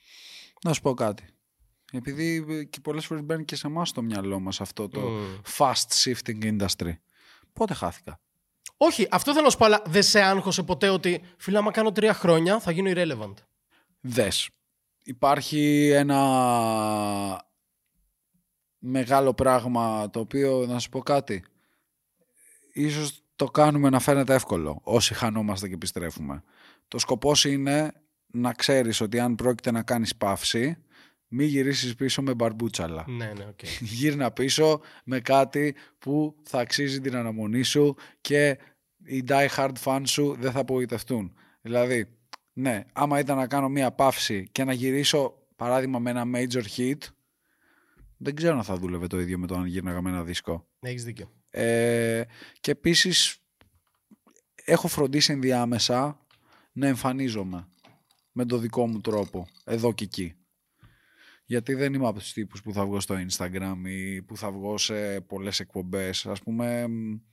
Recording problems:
none

